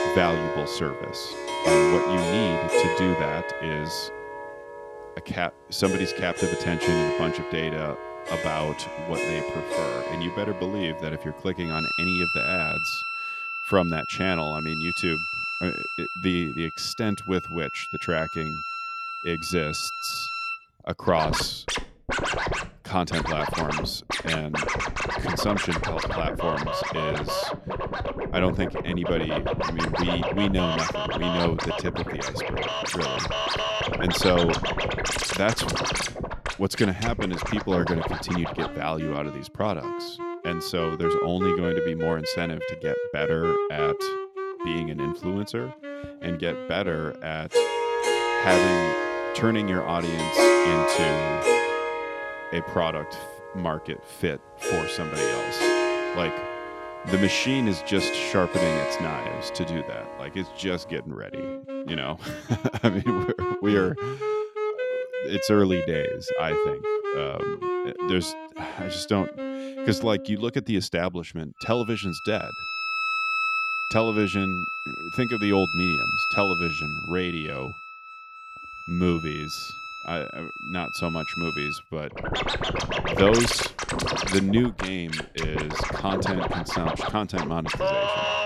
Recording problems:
background music; very loud; throughout; as loud as the speech

